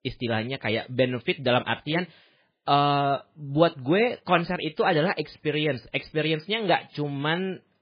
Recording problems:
garbled, watery; badly; nothing above 4 kHz

